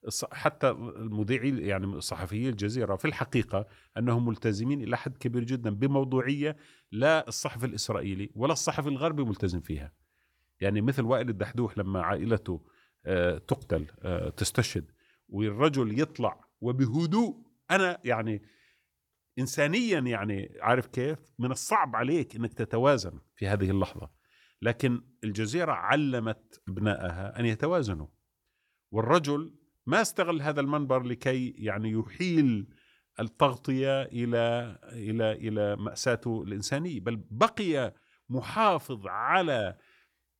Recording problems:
none

